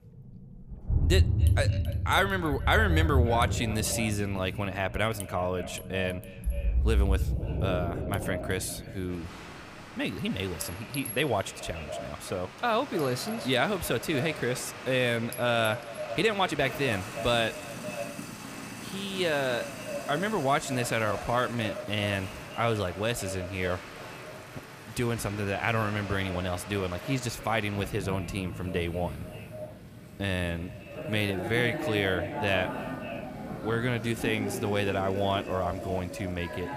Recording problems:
echo of what is said; noticeable; throughout; 280 ms later, 15 dB below the speech
rain or running water; loud; throughout; 6 dB below the speech
household noises; noticeable; throughout; 15 dB below the speech
uneven, jittery; strongly; from 16 to 32 s

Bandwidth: 15 kHz